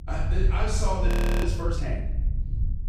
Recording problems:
room echo; strong; dies away in 0.9 s
off-mic speech; far
low rumble; noticeable; throughout; 10 dB below the speech
audio freezing; at 1 s

